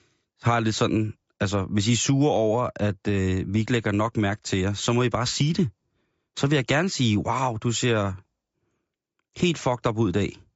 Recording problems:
high frequencies cut off; noticeable; nothing above 8 kHz

